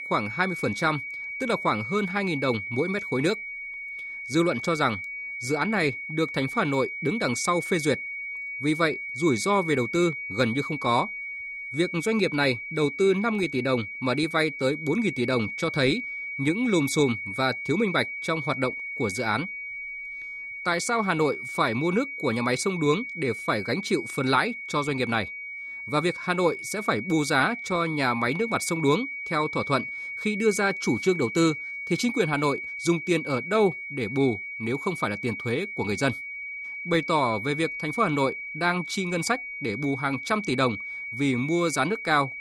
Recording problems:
high-pitched whine; loud; throughout; 2.5 kHz, 7 dB below the speech

